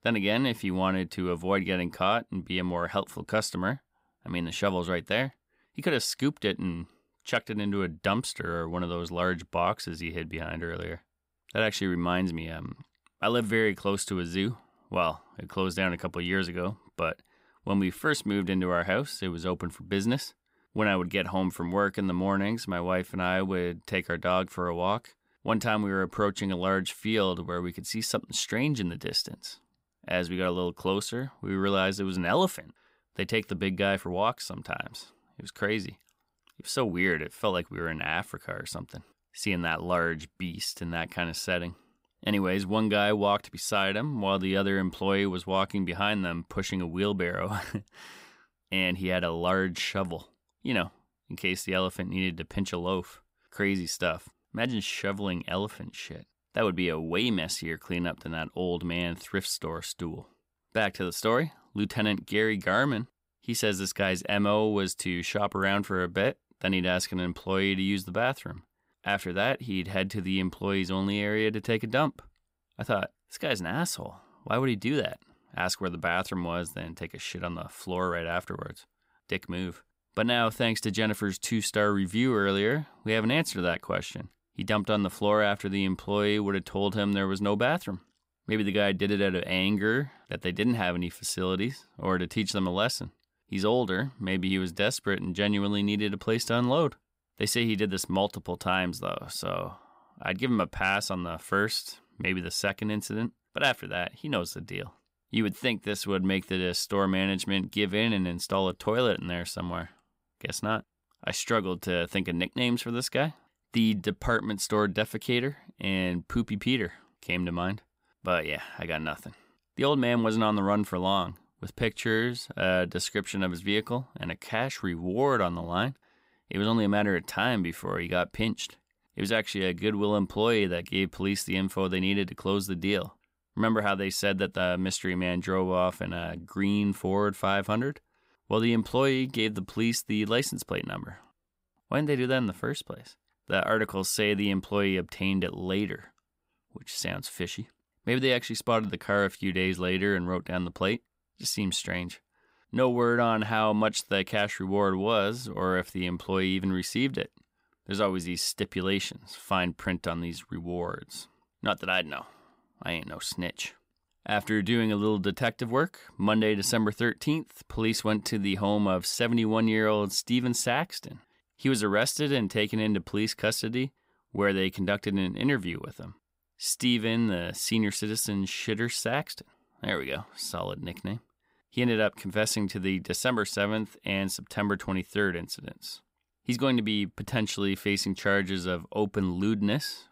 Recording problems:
none

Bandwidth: 15.5 kHz